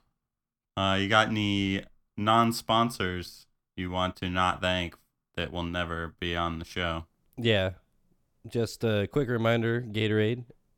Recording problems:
none

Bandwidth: 18 kHz